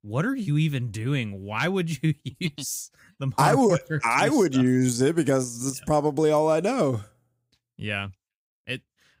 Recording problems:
none

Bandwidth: 15.5 kHz